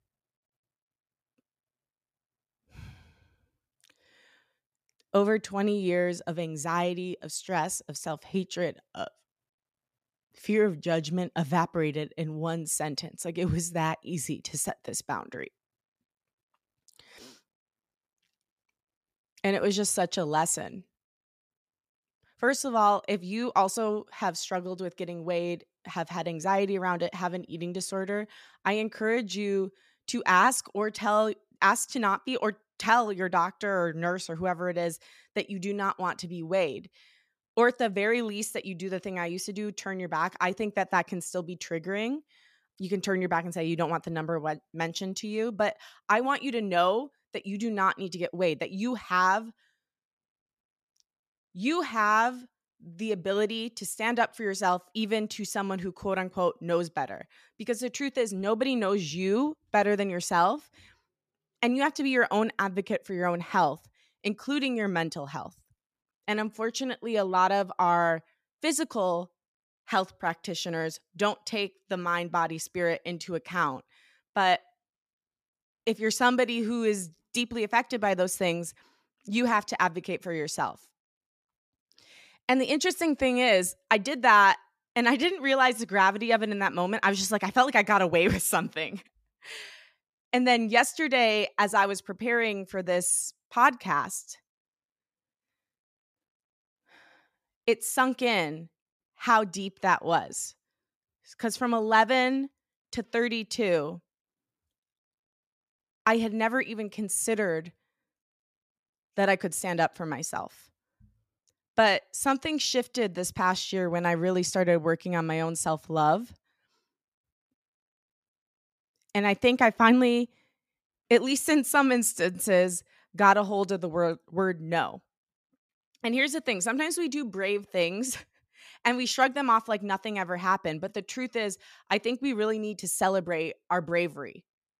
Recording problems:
none

